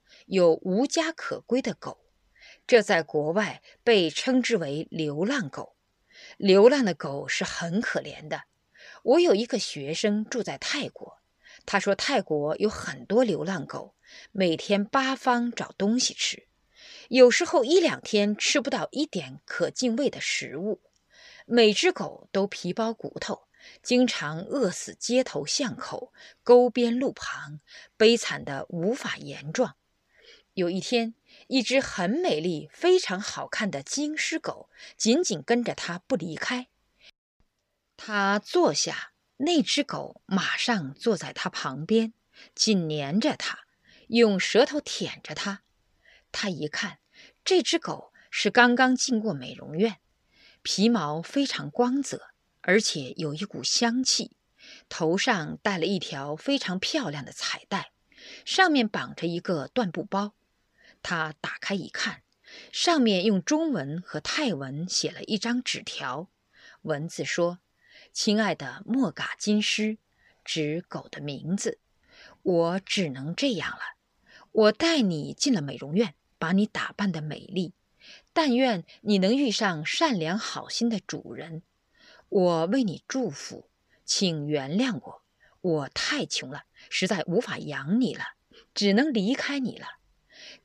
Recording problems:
uneven, jittery; strongly; from 2.5 s to 1:29

